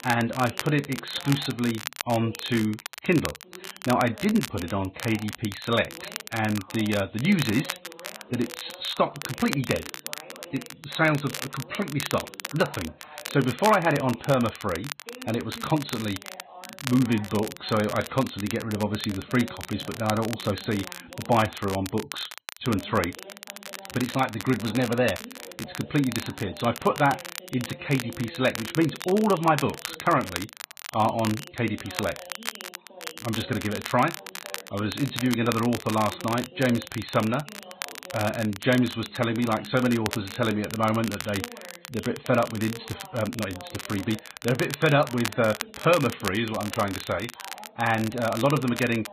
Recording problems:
garbled, watery; badly; nothing above 4 kHz
crackle, like an old record; noticeable; 10 dB below the speech
voice in the background; faint; throughout; 20 dB below the speech

